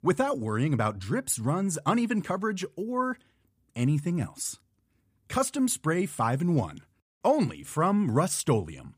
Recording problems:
none

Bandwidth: 15 kHz